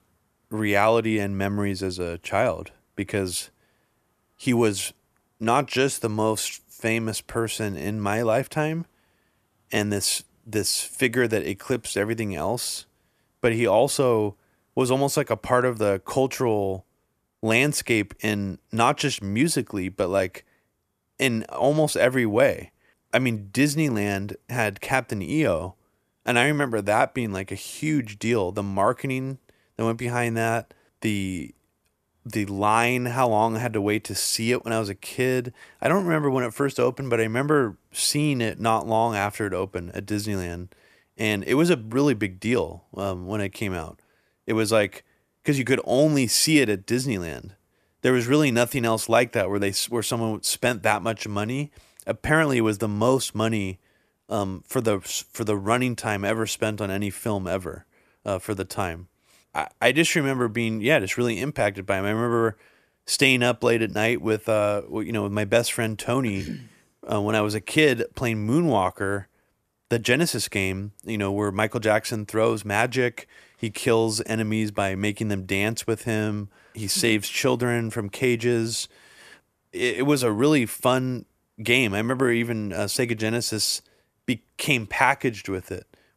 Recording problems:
none

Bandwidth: 14.5 kHz